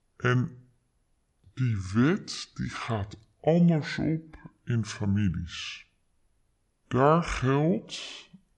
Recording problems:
wrong speed and pitch; too slow and too low; 0.6 times normal speed

